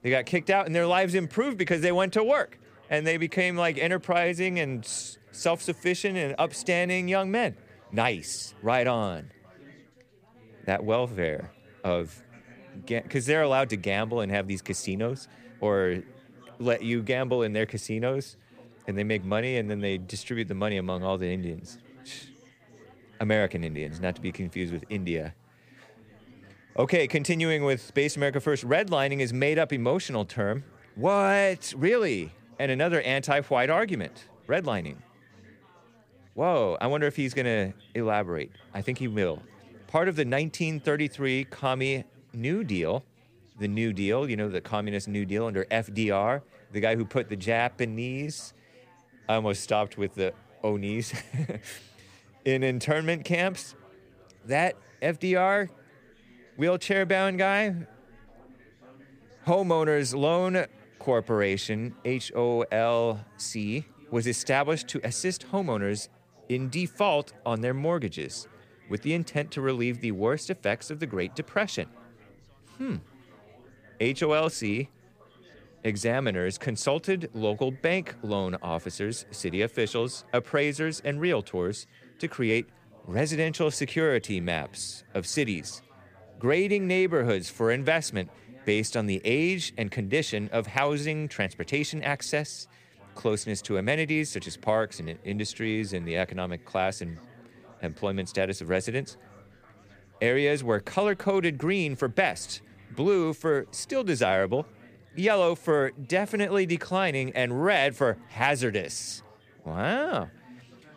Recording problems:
chatter from many people; faint; throughout; 25 dB below the speech

